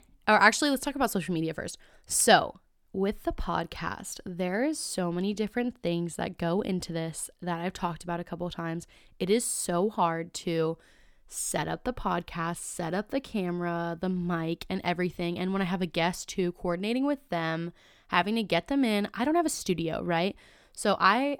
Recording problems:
none

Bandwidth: 18 kHz